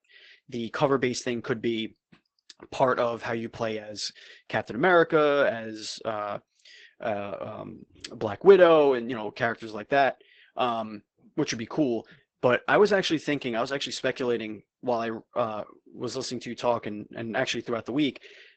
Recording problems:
garbled, watery; badly; nothing above 8 kHz

